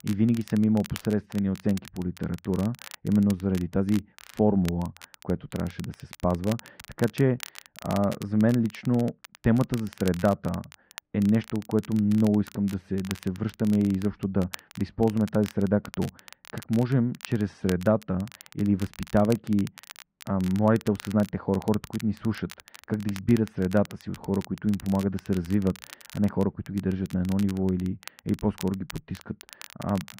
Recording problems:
muffled; very; fading above 1.5 kHz
crackle, like an old record; noticeable; 20 dB below the speech

